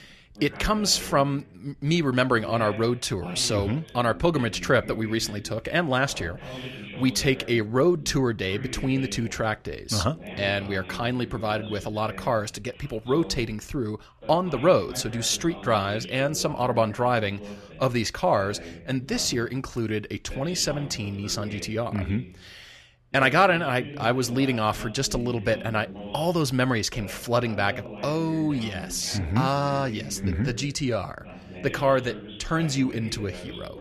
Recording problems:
voice in the background; noticeable; throughout; 15 dB below the speech

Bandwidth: 13.5 kHz